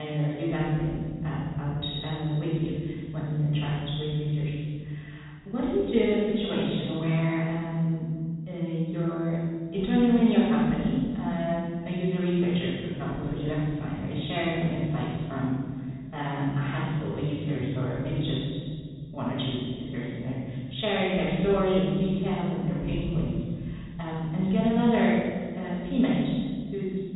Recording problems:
room echo; strong; dies away in 2 s
off-mic speech; far
high frequencies cut off; severe; nothing above 4 kHz
abrupt cut into speech; at the start

